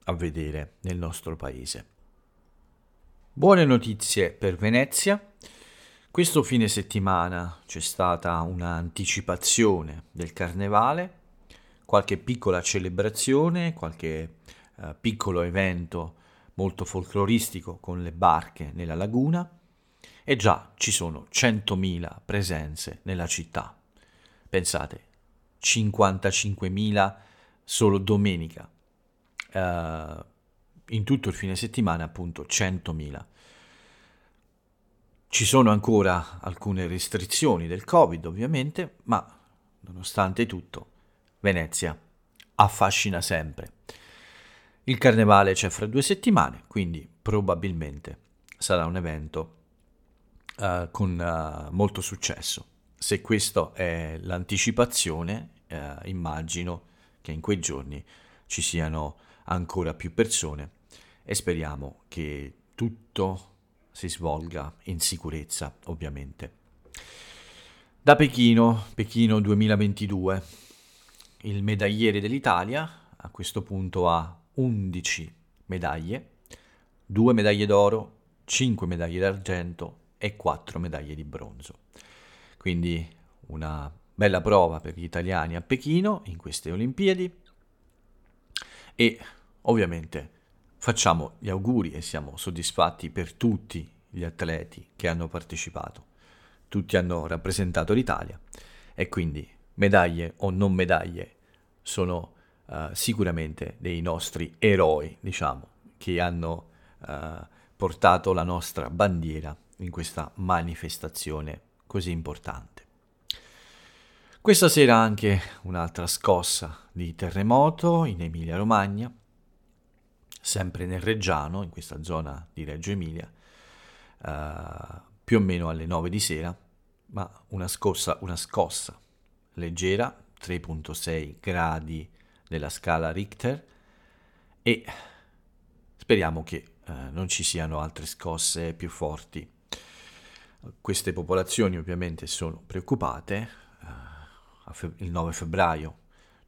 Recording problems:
none

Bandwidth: 17.5 kHz